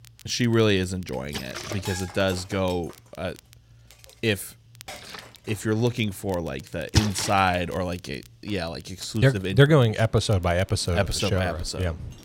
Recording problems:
rain or running water; loud; throughout; 7 dB below the speech
household noises; noticeable; throughout; 20 dB below the speech
crackle, like an old record; faint; 25 dB below the speech

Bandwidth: 16 kHz